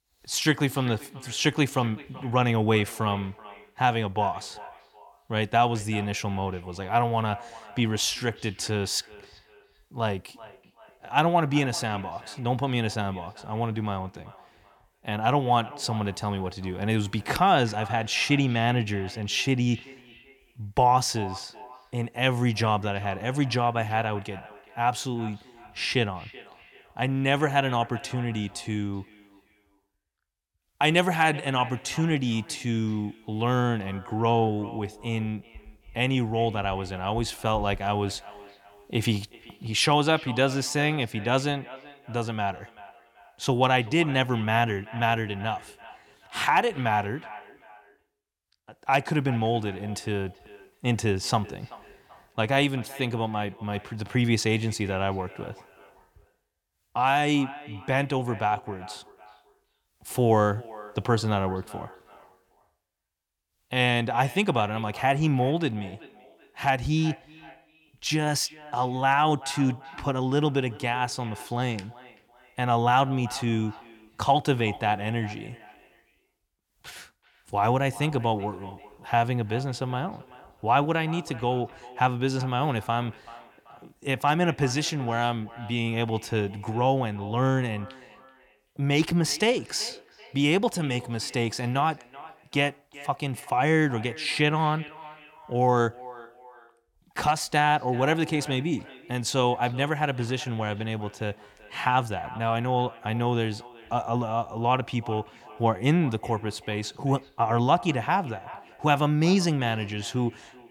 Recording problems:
echo of what is said; faint; throughout; 380 ms later, 20 dB below the speech

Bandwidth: 18.5 kHz